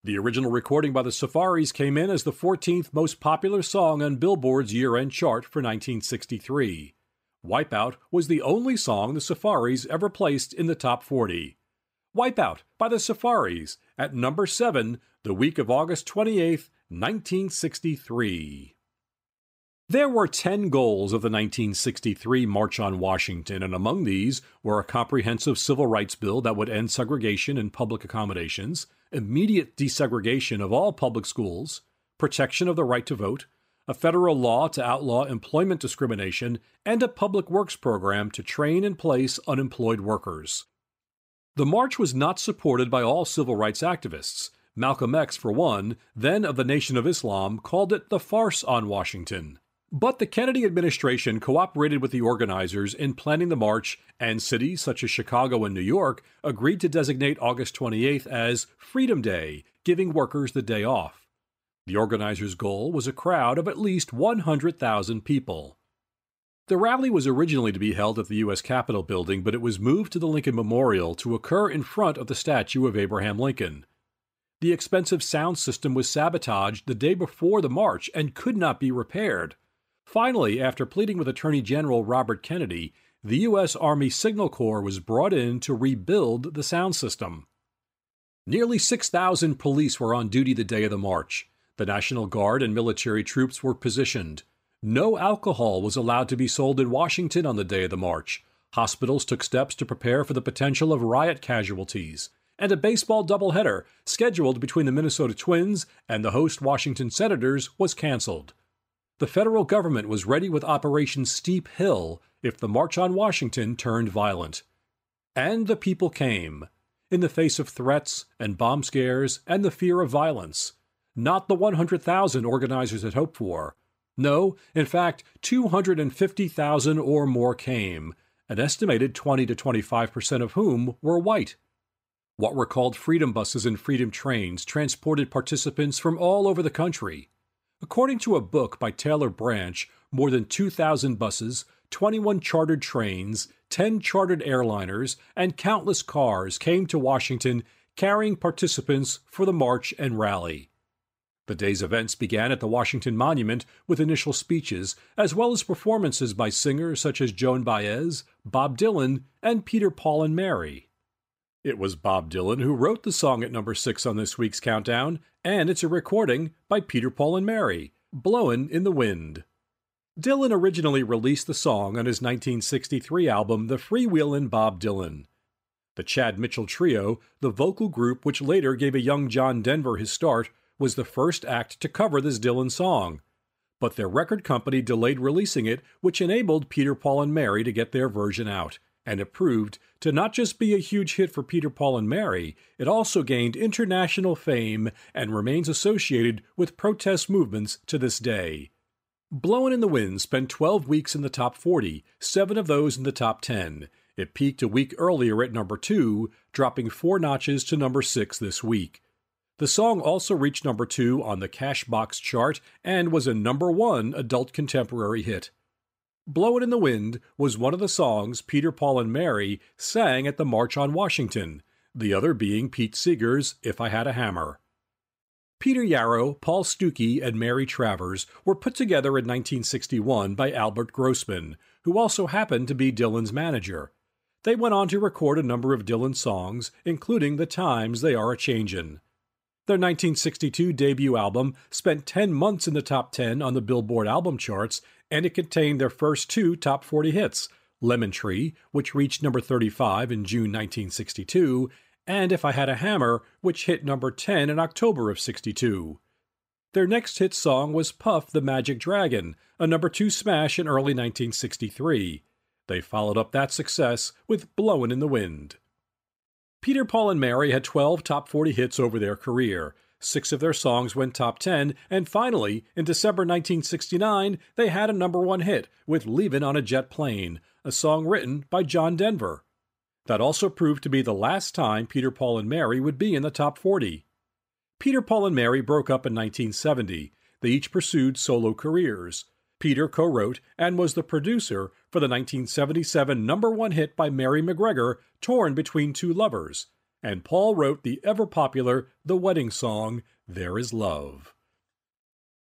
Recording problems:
none

